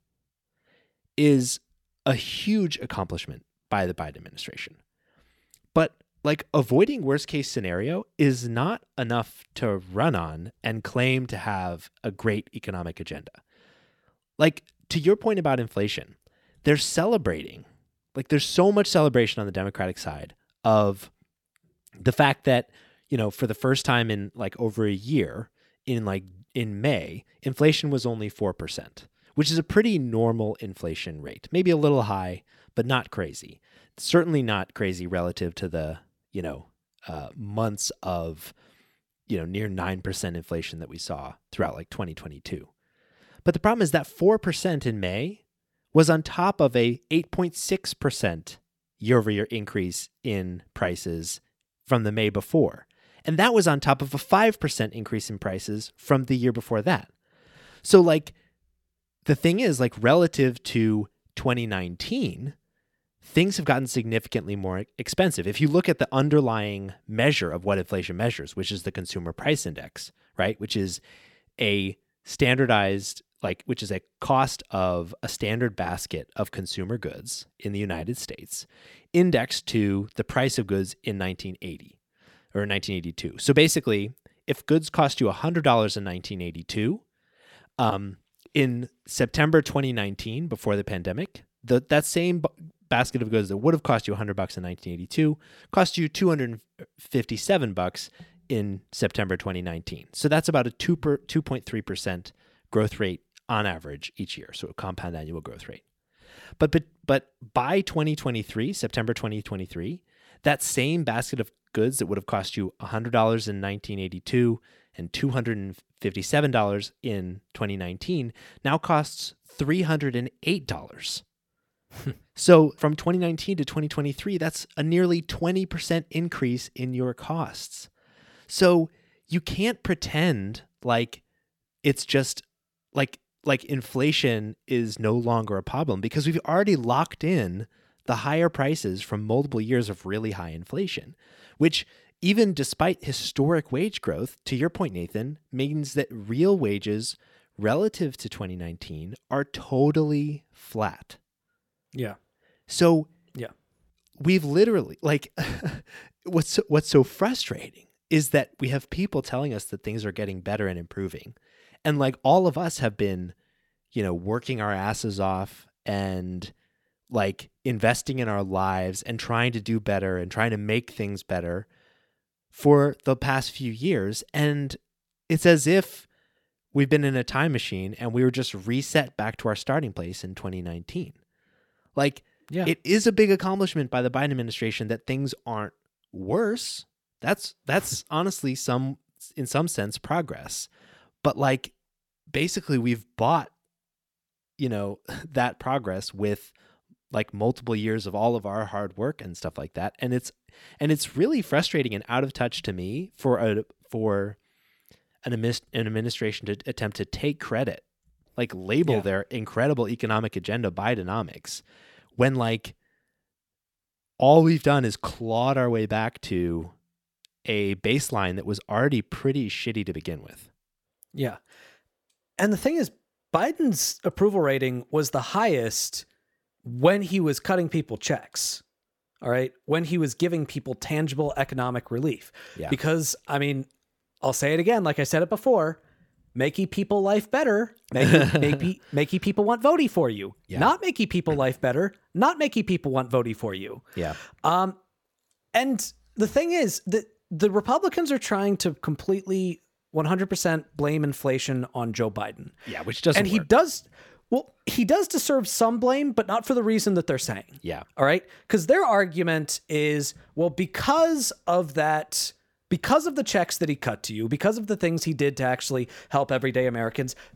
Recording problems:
none

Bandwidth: 18 kHz